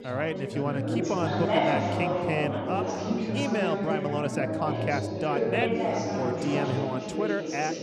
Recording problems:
chatter from many people; very loud; throughout; 2 dB above the speech

